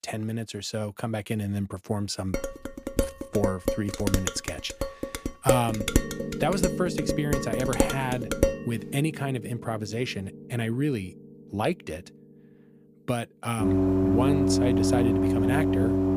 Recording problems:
background music; very loud; from 6 s on; 3 dB above the speech
clattering dishes; loud; from 2.5 to 8.5 s; peak 5 dB above the speech

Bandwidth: 15 kHz